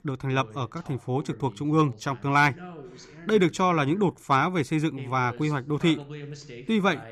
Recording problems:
voice in the background; noticeable; throughout; 20 dB below the speech

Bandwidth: 15 kHz